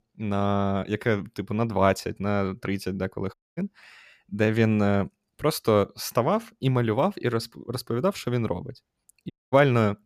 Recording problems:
audio cutting out; at 3.5 s and at 9.5 s

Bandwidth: 14.5 kHz